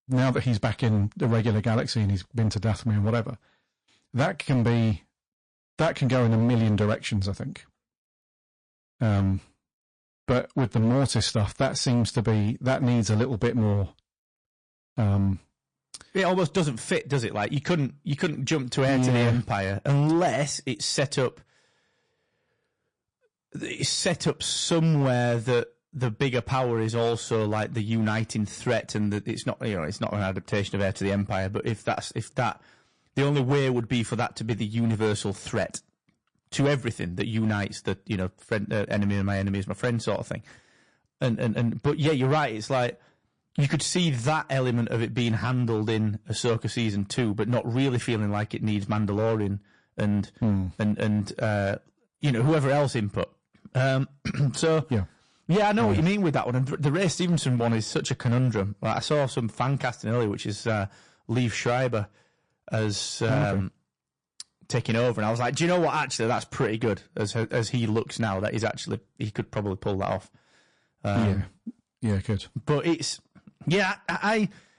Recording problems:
distortion; slight; 7% of the sound clipped
garbled, watery; slightly

